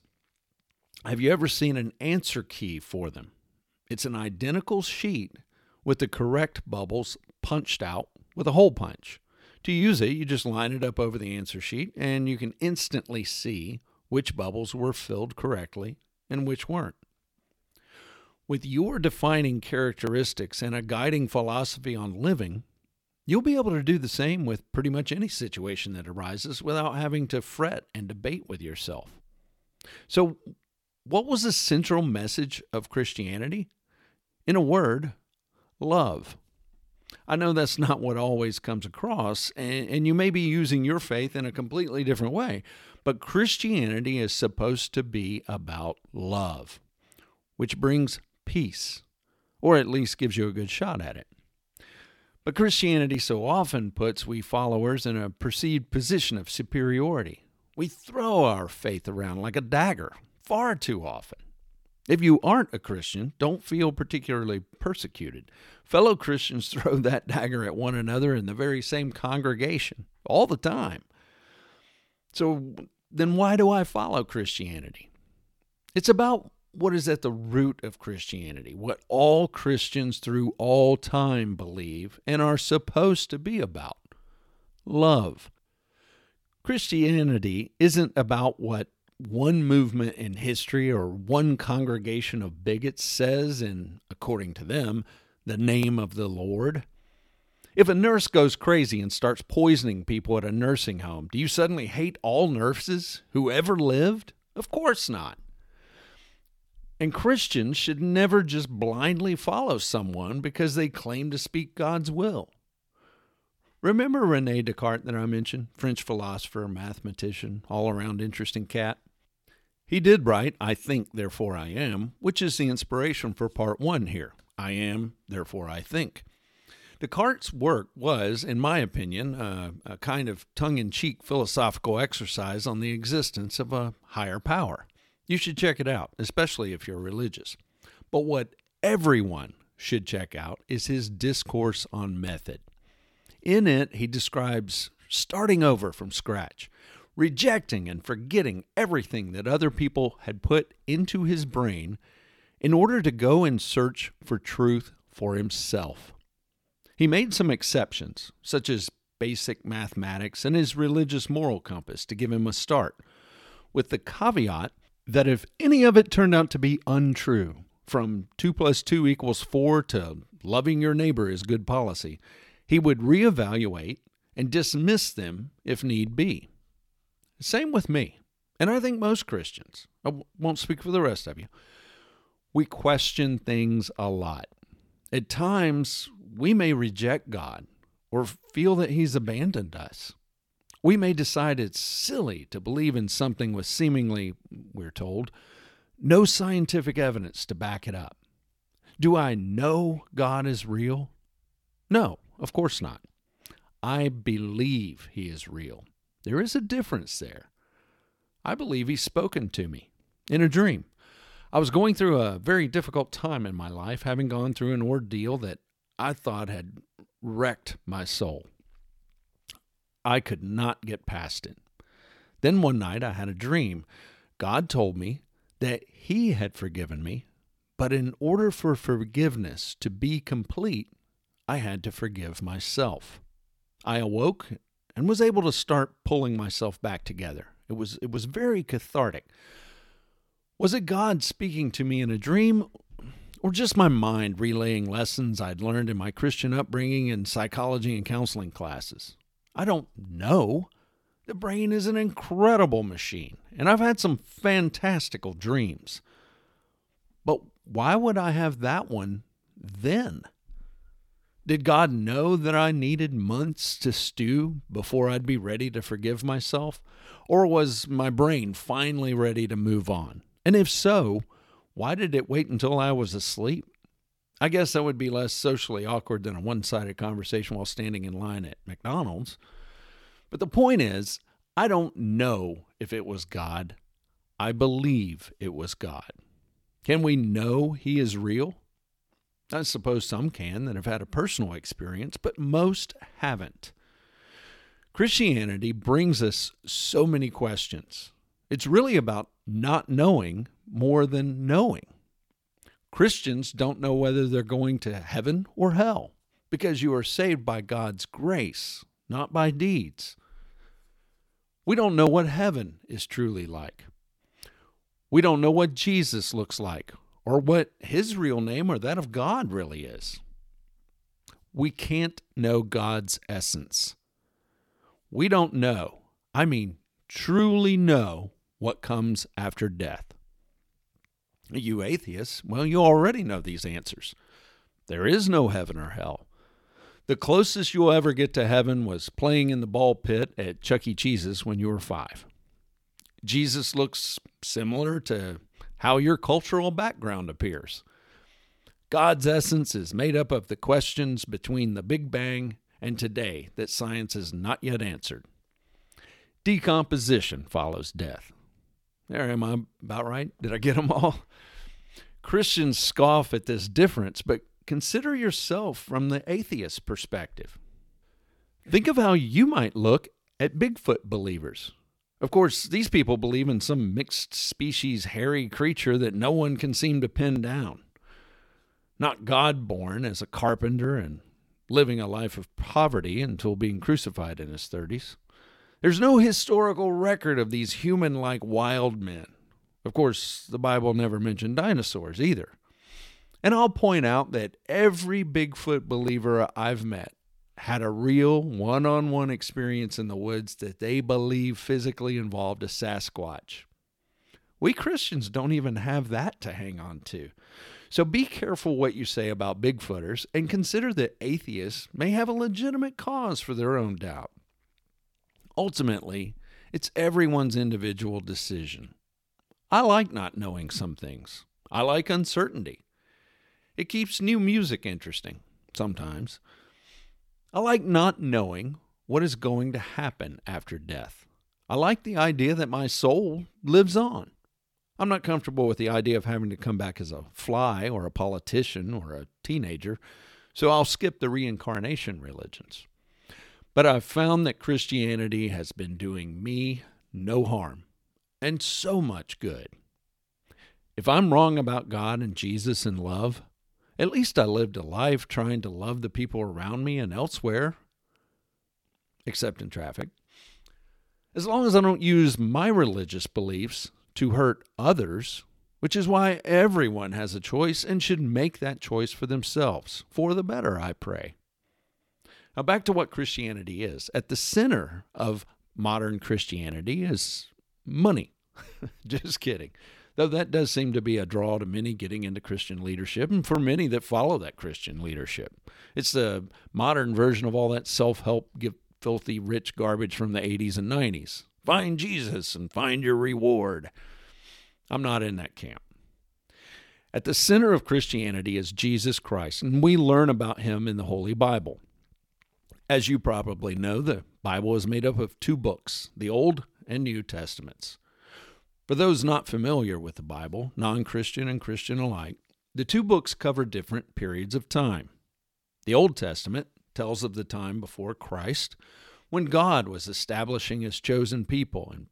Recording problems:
none

